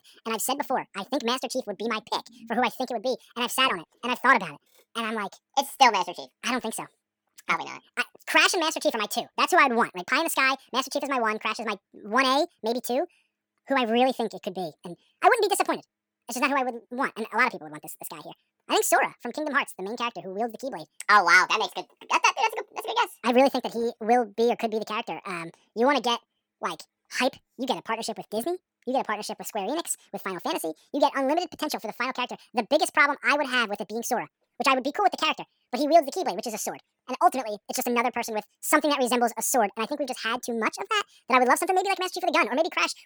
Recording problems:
wrong speed and pitch; too fast and too high; 1.7 times normal speed

